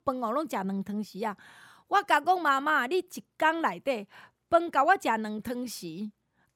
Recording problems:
none

